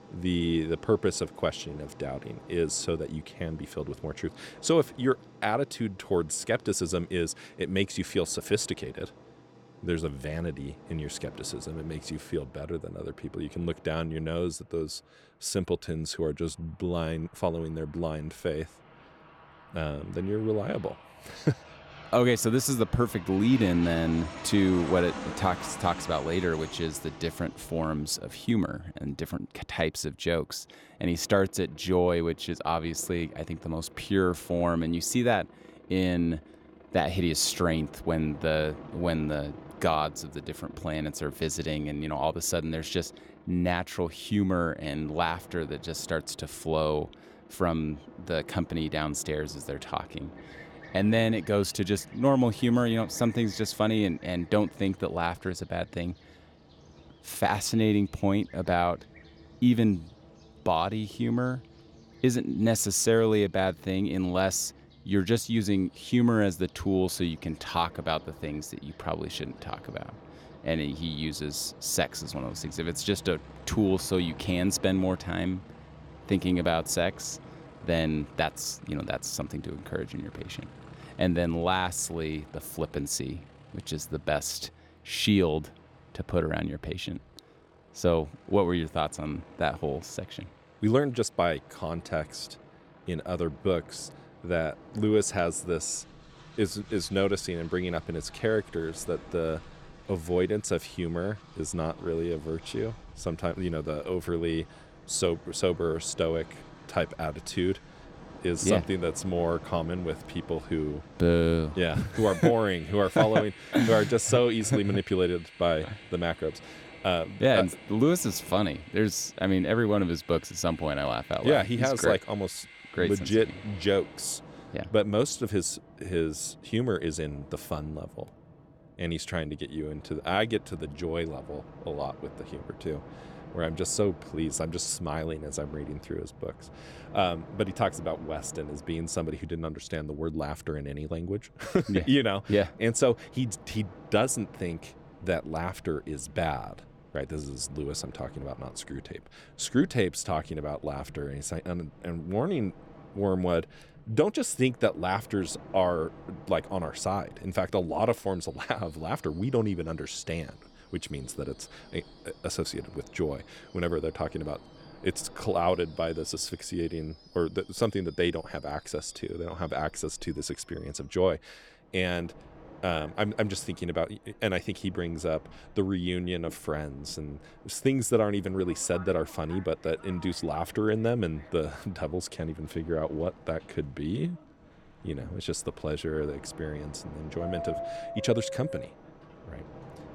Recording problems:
train or aircraft noise; noticeable; throughout; 20 dB below the speech

